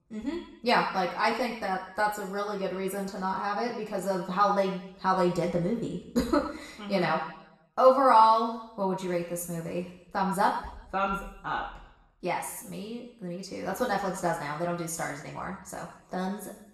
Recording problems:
off-mic speech; far
room echo; noticeable; dies away in 0.8 s

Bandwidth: 13.5 kHz